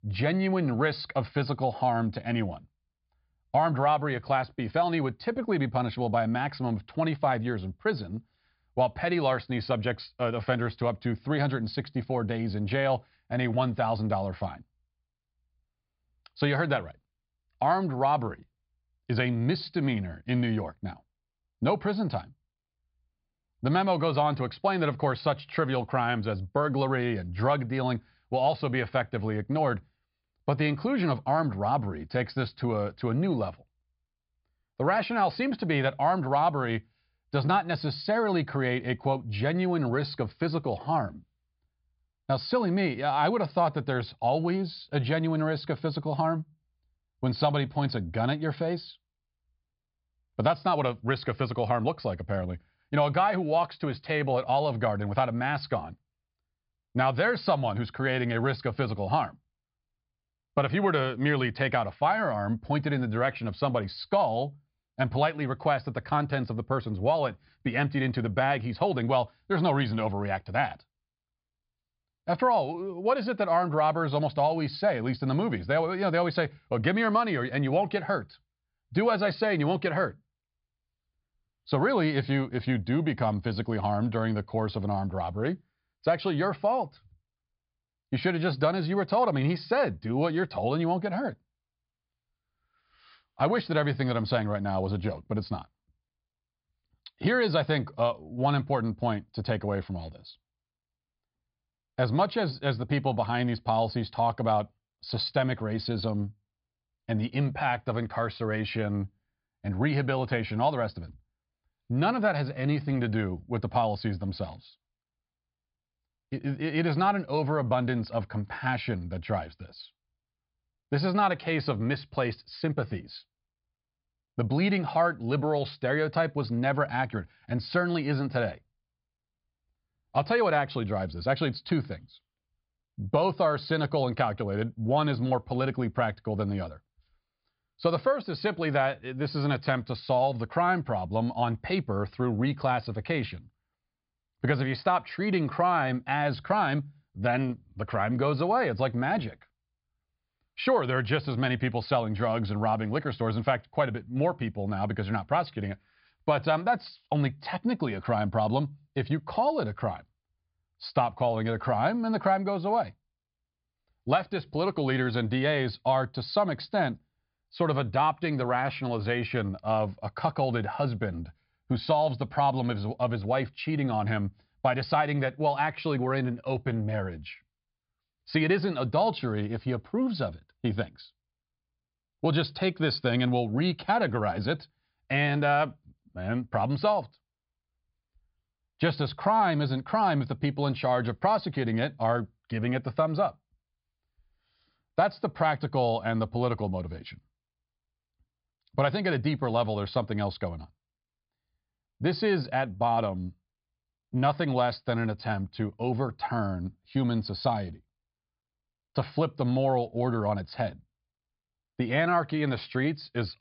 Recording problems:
high frequencies cut off; severe; nothing above 5 kHz

